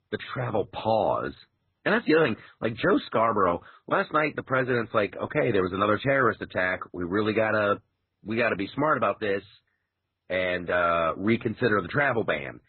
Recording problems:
garbled, watery; badly; nothing above 4 kHz

